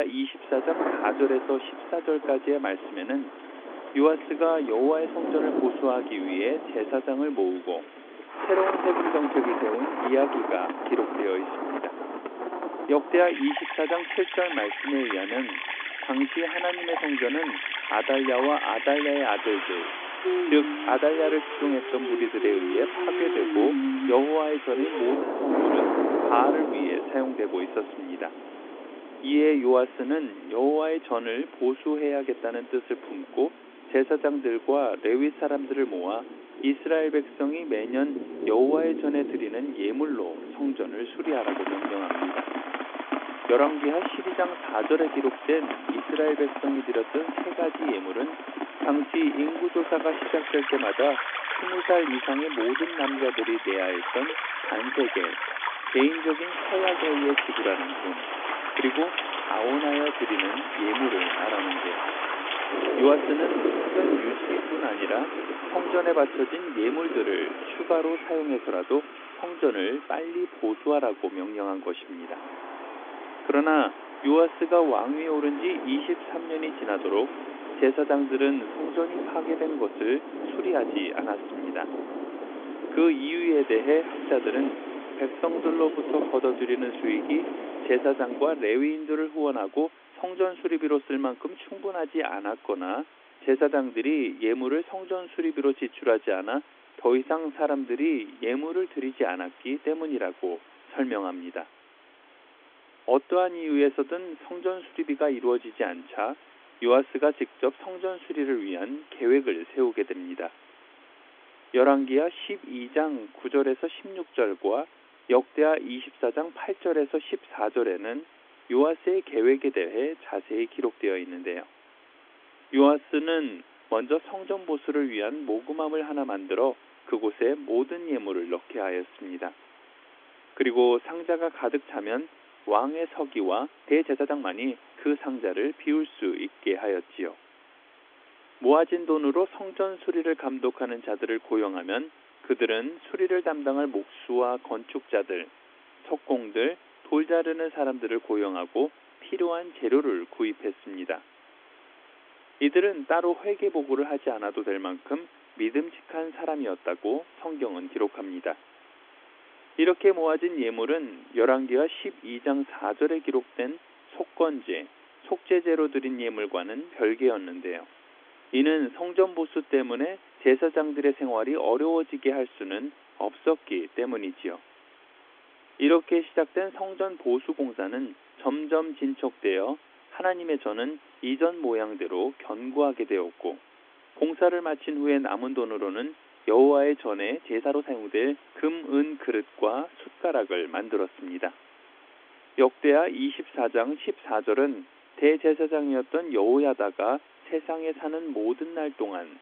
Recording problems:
phone-call audio; nothing above 3.5 kHz
rain or running water; loud; until 1:28; 4 dB below the speech
hiss; faint; throughout; 25 dB below the speech
abrupt cut into speech; at the start
uneven, jittery; strongly; from 49 s to 3:08

